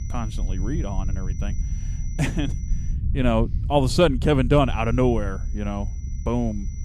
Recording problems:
high-pitched whine; faint; until 3 s and from 4.5 s on; 6 kHz, 25 dB below the speech
low rumble; faint; throughout; 20 dB below the speech

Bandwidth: 15.5 kHz